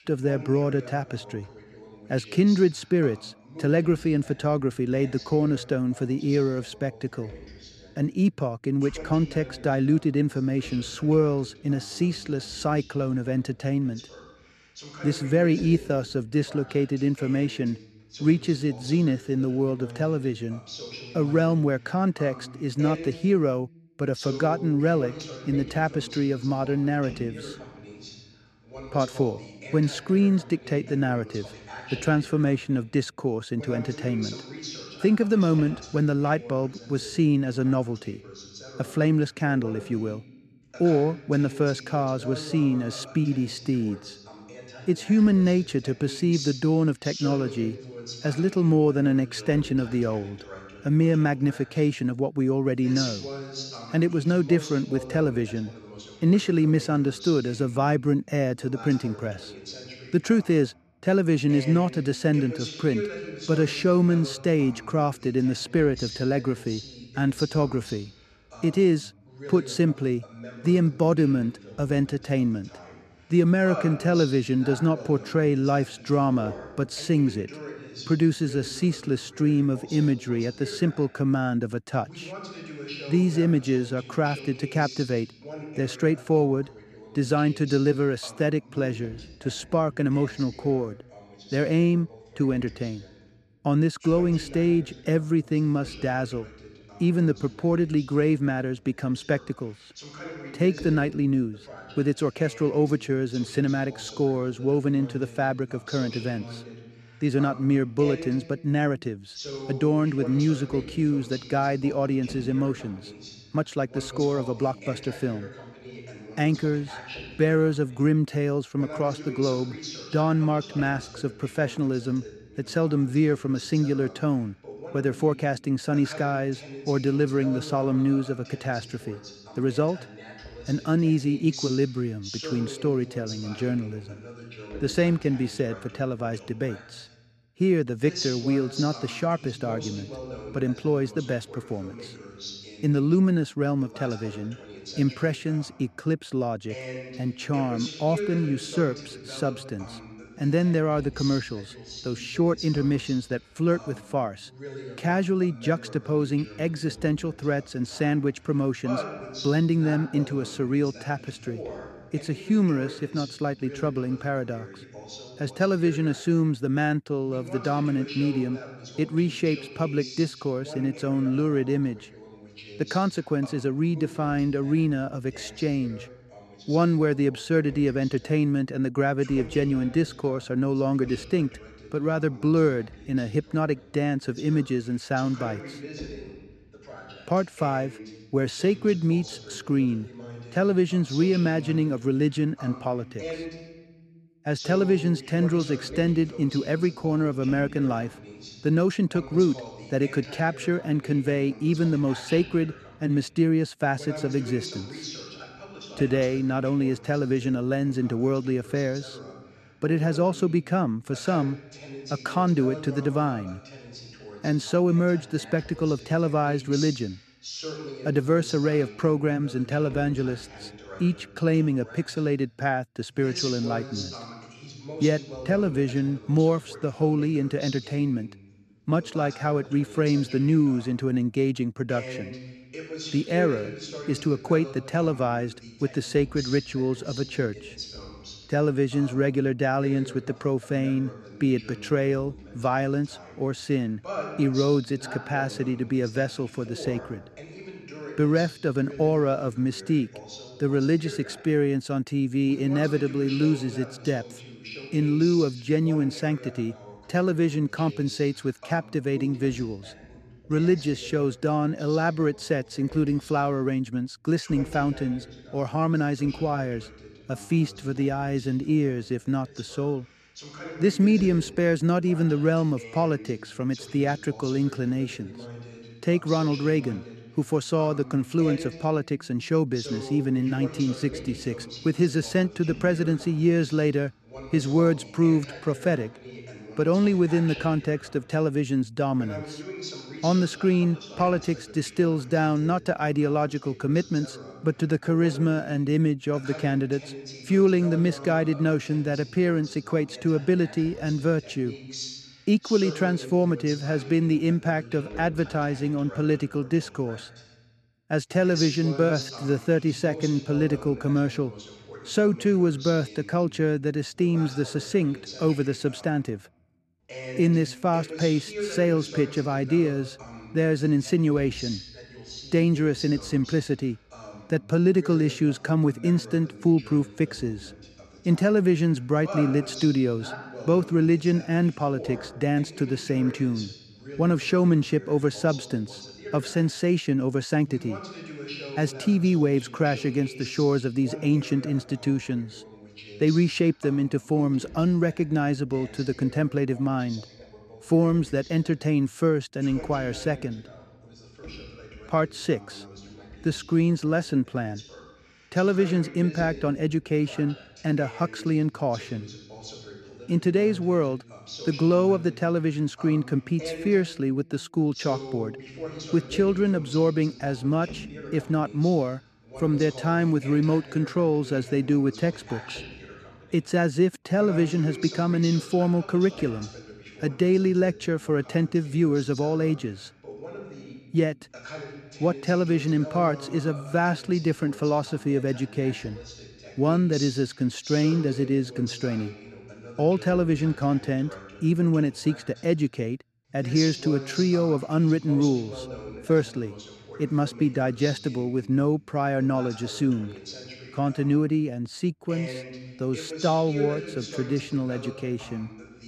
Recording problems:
voice in the background; noticeable; throughout; 15 dB below the speech

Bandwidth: 13.5 kHz